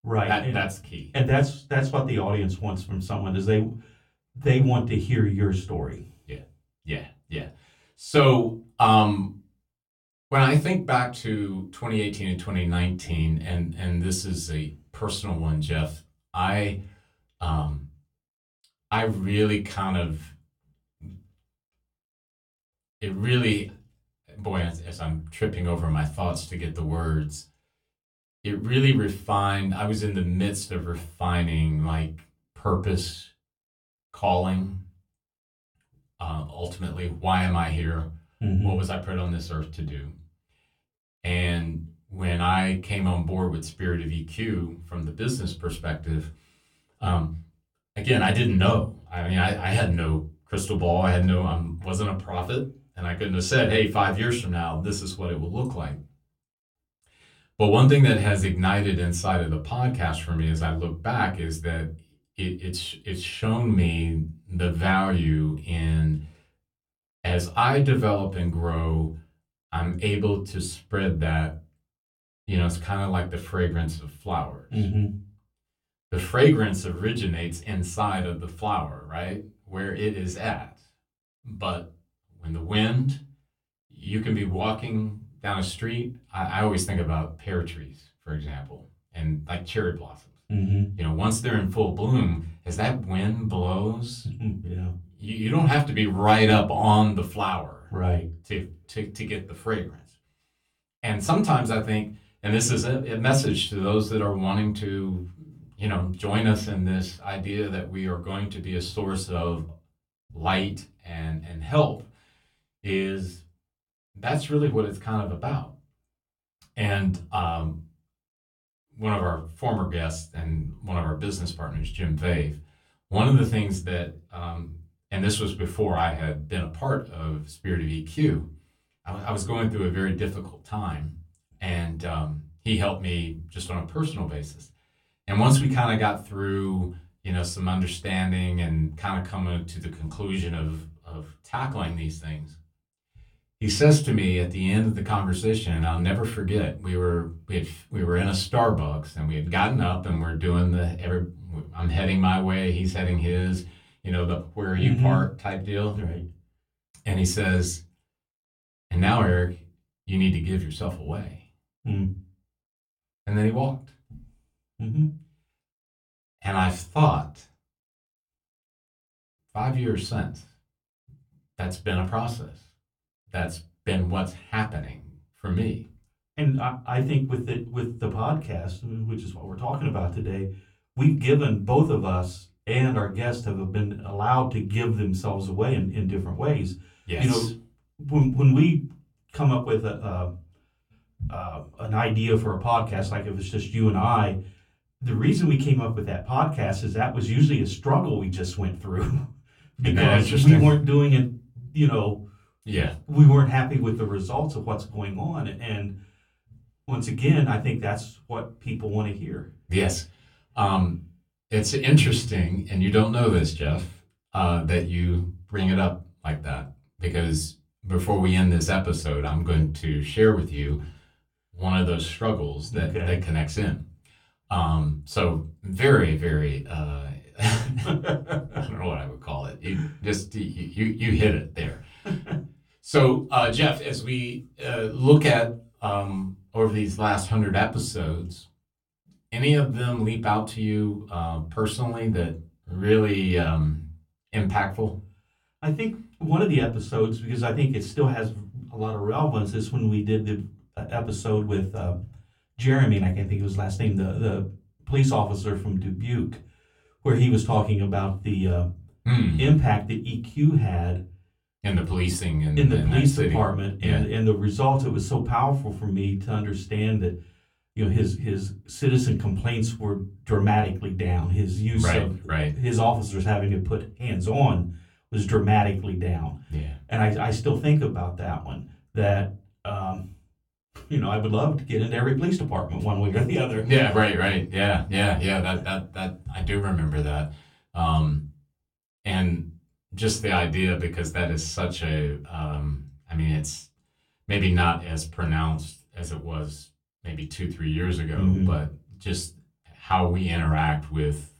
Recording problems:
off-mic speech; far
room echo; very slight; dies away in 0.3 s

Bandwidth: 18 kHz